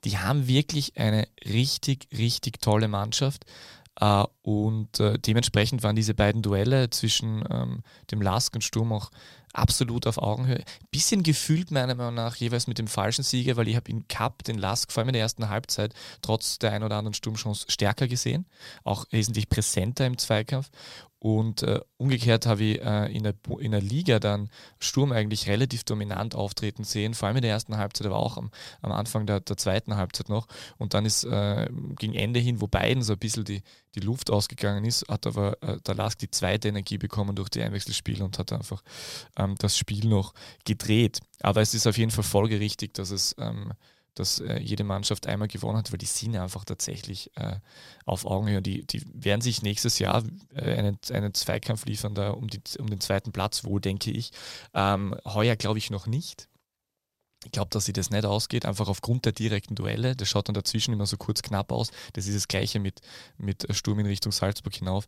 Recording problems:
none

